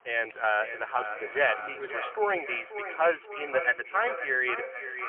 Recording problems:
phone-call audio; poor line; nothing above 3 kHz
echo of what is said; strong; throughout; 530 ms later, 8 dB below the speech
traffic noise; faint; throughout; 25 dB below the speech

